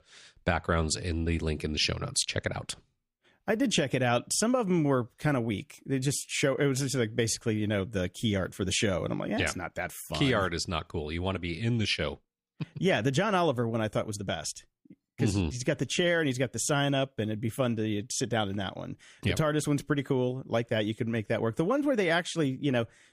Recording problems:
none

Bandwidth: 15 kHz